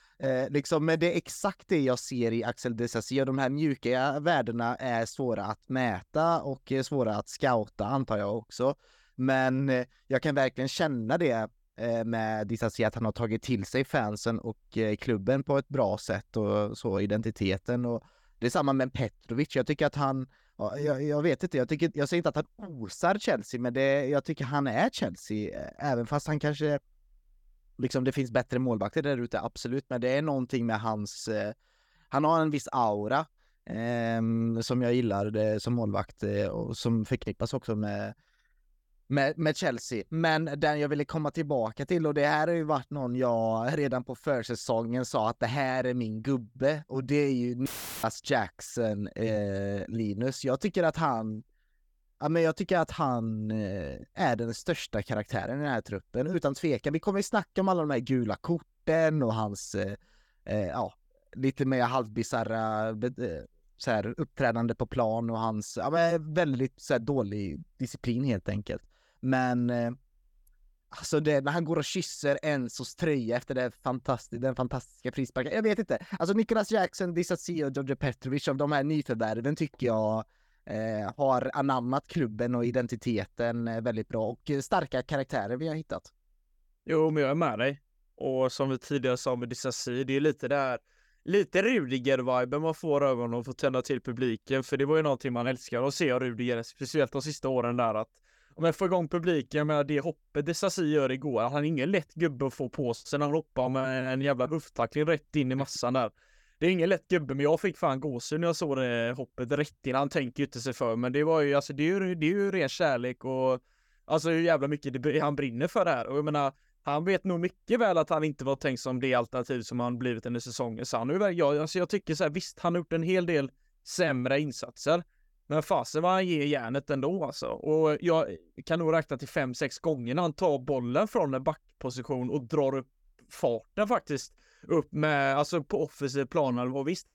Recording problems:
audio cutting out; filled with static; at 48 s

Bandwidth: 18 kHz